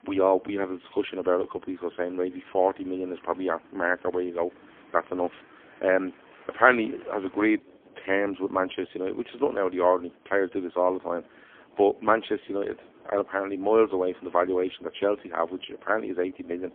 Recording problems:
phone-call audio; poor line; nothing above 3.5 kHz
traffic noise; faint; throughout; 25 dB below the speech

